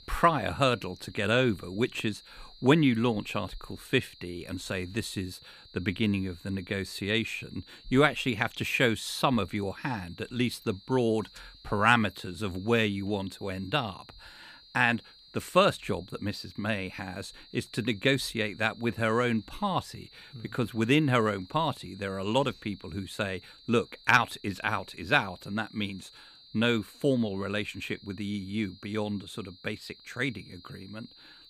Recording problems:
high-pitched whine; faint; throughout; 4 kHz, 25 dB below the speech

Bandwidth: 14.5 kHz